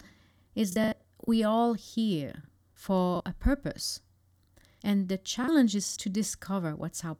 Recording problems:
choppy; very; at 0.5 s, at 3 s and at 5.5 s; 8% of the speech affected

